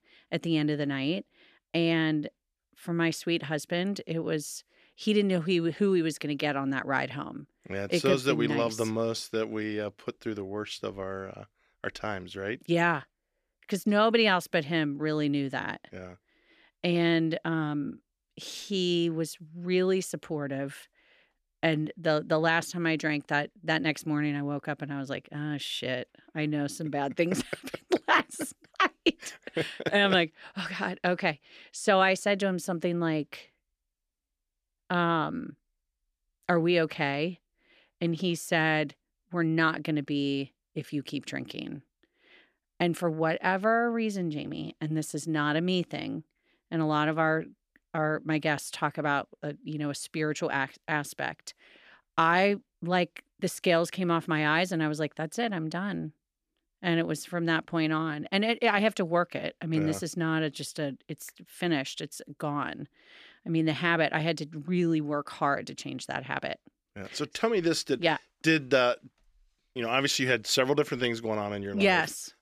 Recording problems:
none

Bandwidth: 14.5 kHz